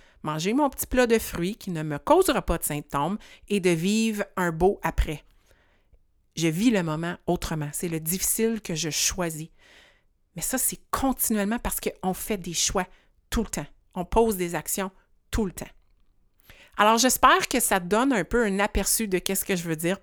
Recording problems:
none

